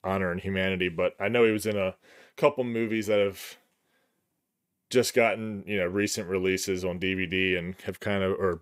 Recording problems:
none

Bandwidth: 15.5 kHz